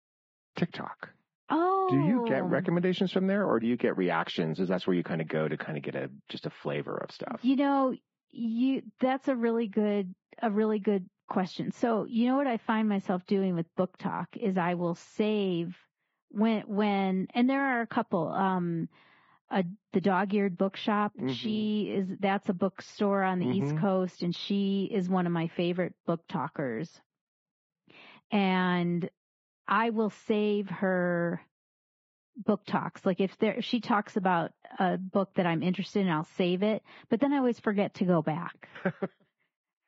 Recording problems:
garbled, watery; badly
high frequencies cut off; noticeable; nothing above 7.5 kHz
muffled; very slightly; fading above 3.5 kHz

